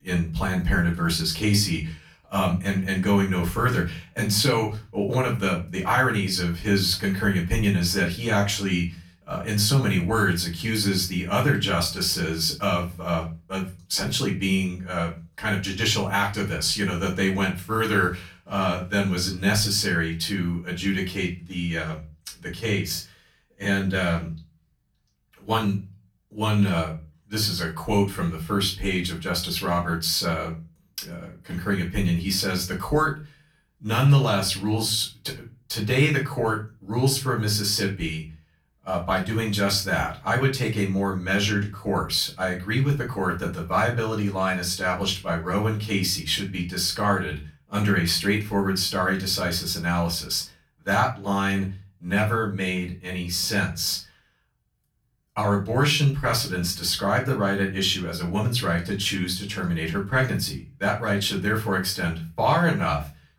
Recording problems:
off-mic speech; far
room echo; very slight; dies away in 0.3 s

